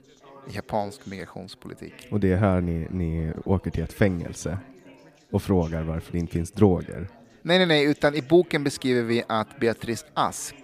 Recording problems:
background chatter; faint; throughout; 4 voices, 25 dB below the speech

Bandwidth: 15 kHz